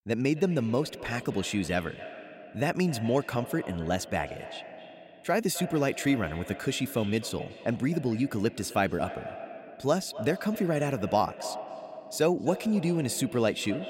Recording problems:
echo of what is said; noticeable; throughout; 260 ms later, 15 dB below the speech

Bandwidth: 16 kHz